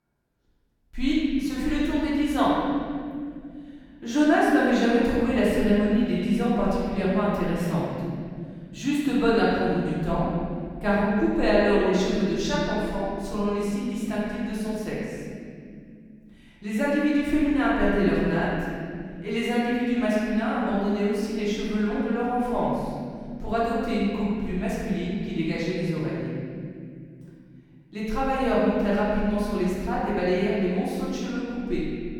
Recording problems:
room echo; strong; dies away in 2.7 s
off-mic speech; far

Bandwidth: 17.5 kHz